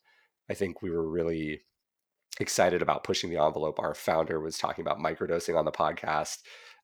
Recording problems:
none

